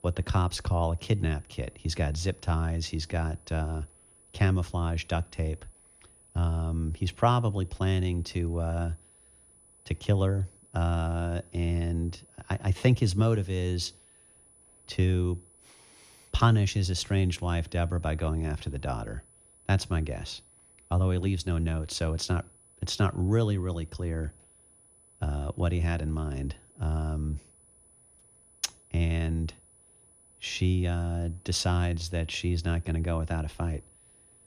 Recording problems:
high-pitched whine; faint; throughout; 10 kHz, 25 dB below the speech

